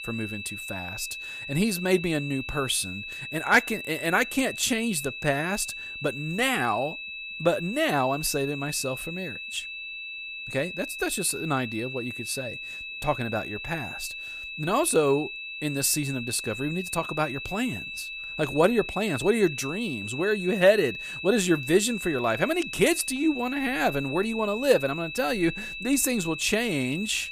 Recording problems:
high-pitched whine; loud; throughout; 2.5 kHz, 8 dB below the speech

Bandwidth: 14.5 kHz